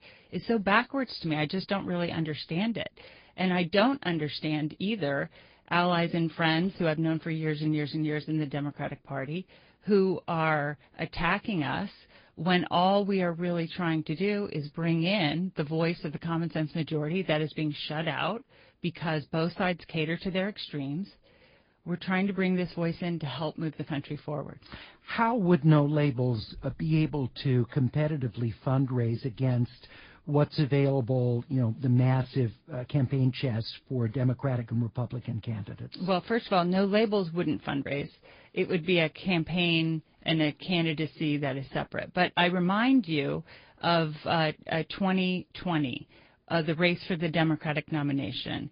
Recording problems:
high frequencies cut off; severe; nothing above 5 kHz
garbled, watery; slightly

